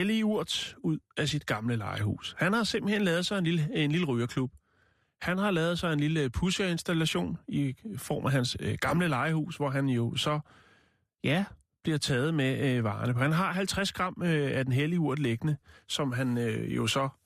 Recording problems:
abrupt cut into speech; at the start

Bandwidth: 14.5 kHz